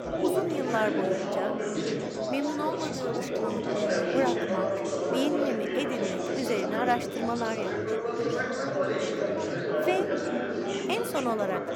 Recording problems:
chatter from many people; very loud; throughout; 2 dB above the speech

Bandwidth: 18 kHz